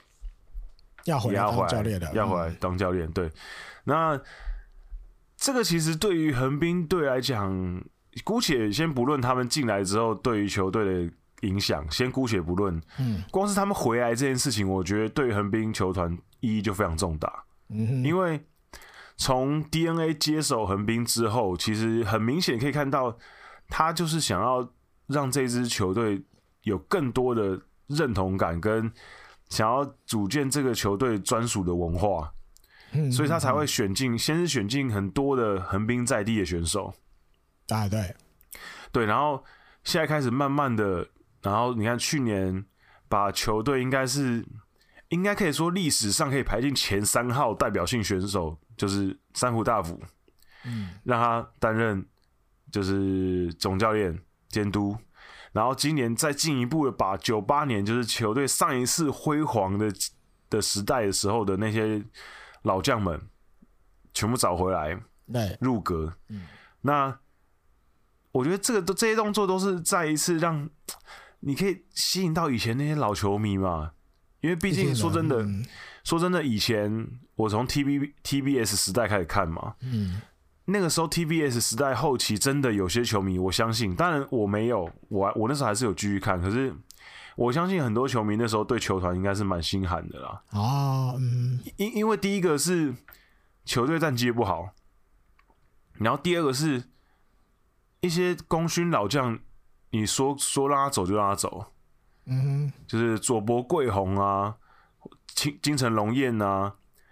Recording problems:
squashed, flat; heavily

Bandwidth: 15 kHz